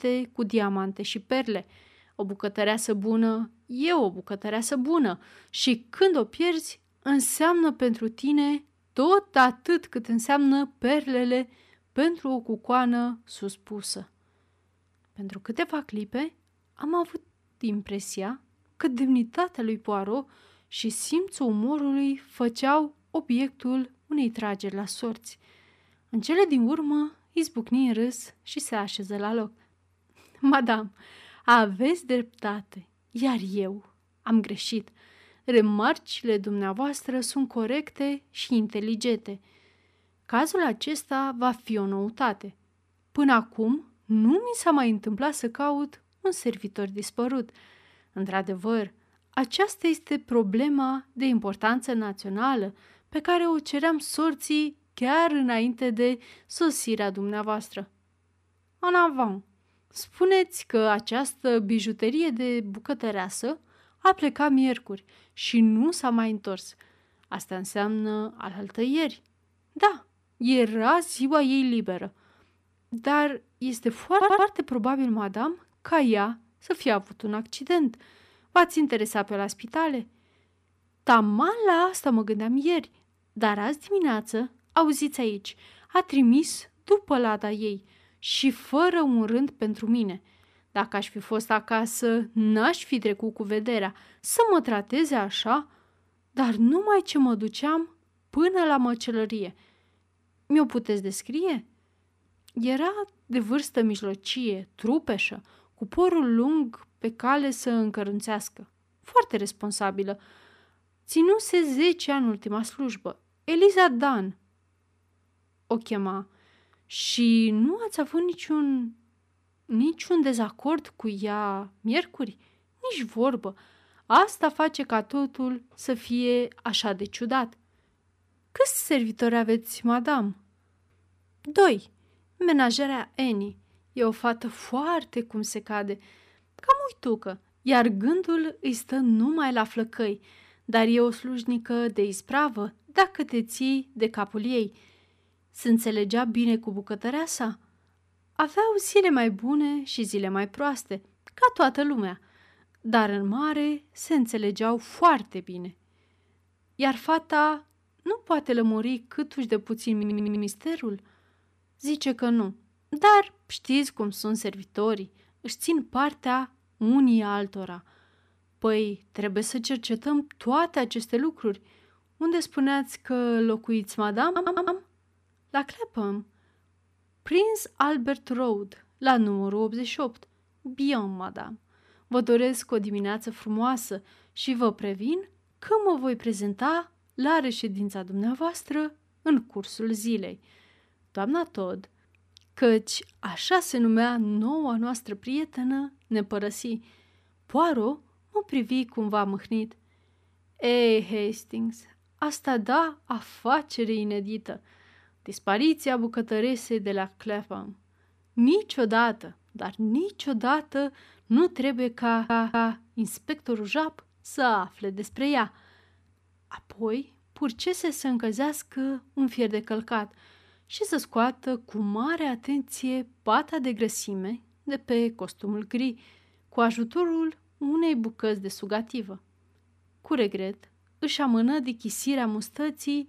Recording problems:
audio stuttering; 4 times, first at 1:14

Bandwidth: 14.5 kHz